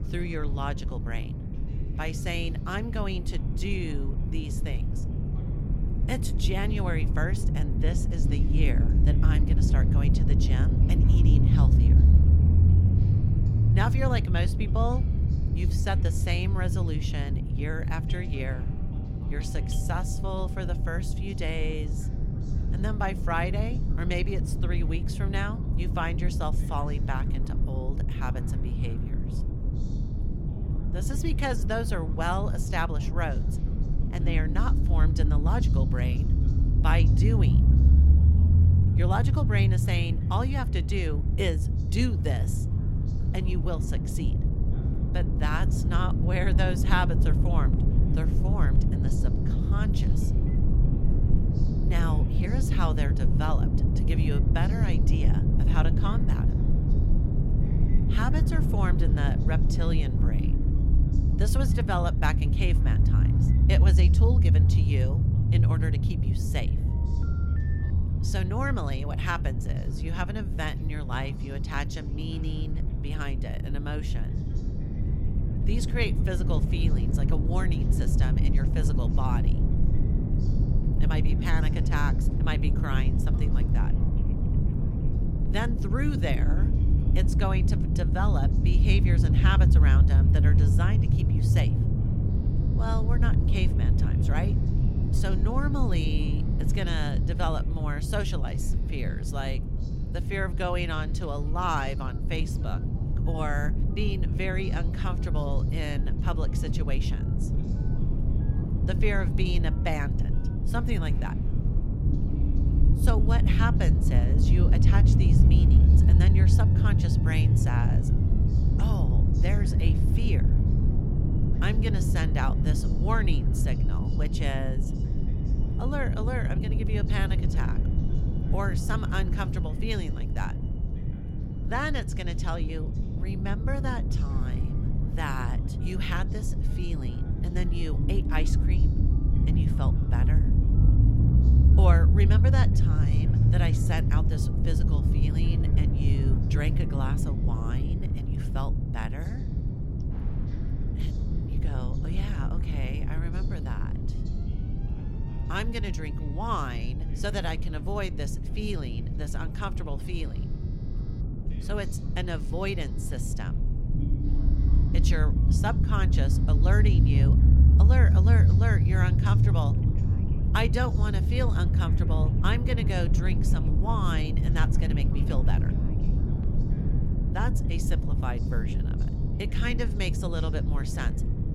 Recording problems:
low rumble; loud; throughout; 4 dB below the speech
alarms or sirens; faint; throughout; 25 dB below the speech
voice in the background; faint; throughout; 20 dB below the speech

